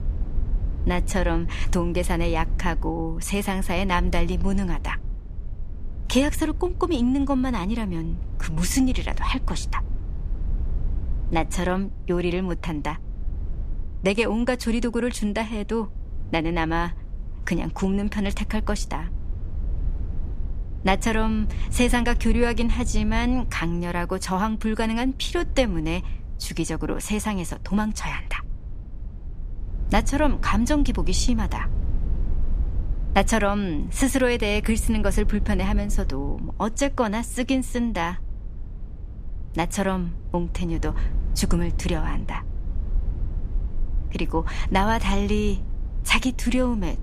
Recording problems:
low rumble; faint; throughout; 20 dB below the speech

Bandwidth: 15 kHz